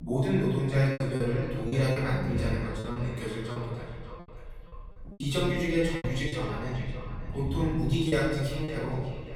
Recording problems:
off-mic speech; far
echo of what is said; noticeable; throughout; 590 ms later, 15 dB below the speech
room echo; noticeable; dies away in 1.2 s
low rumble; noticeable; throughout; 20 dB below the speech
machinery noise; very faint; from 7.5 s on; 25 dB below the speech
choppy; very; 8% of the speech affected

